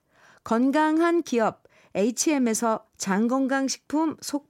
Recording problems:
none

